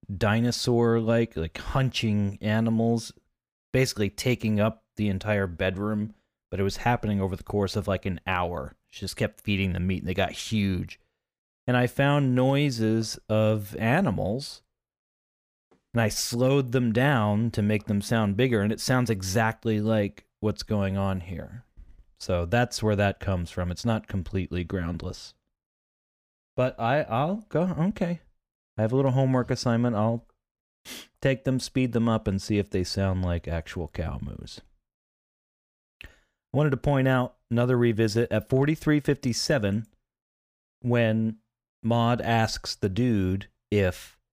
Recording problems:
none

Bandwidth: 15 kHz